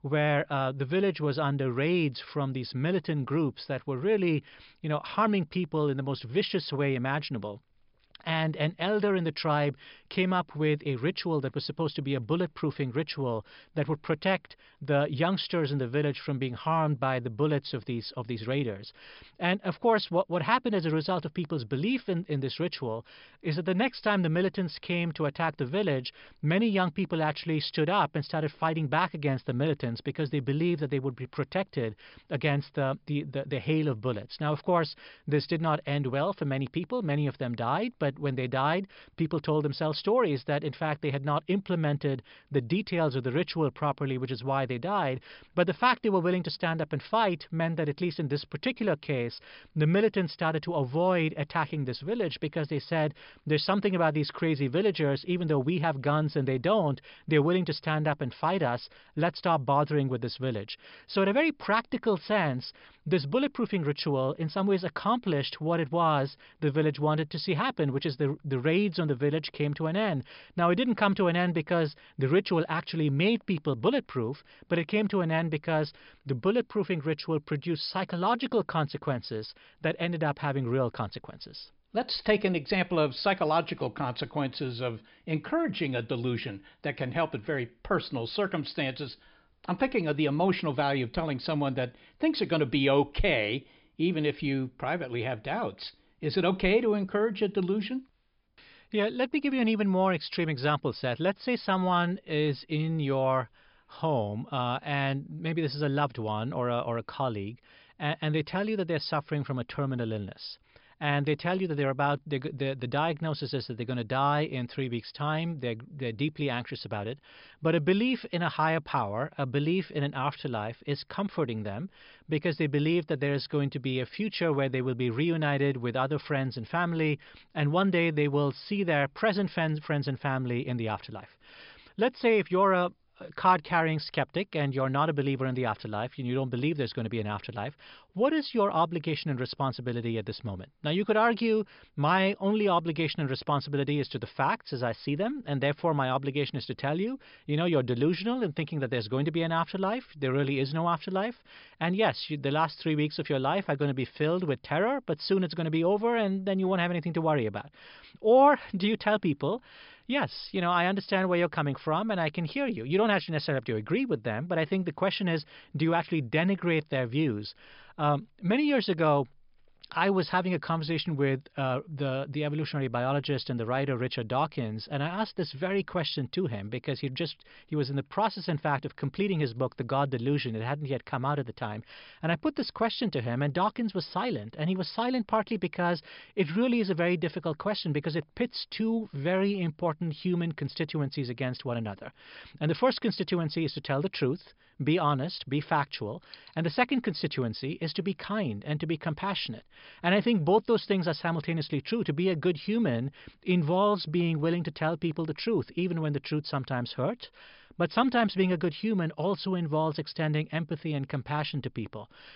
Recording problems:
high frequencies cut off; noticeable; nothing above 5.5 kHz

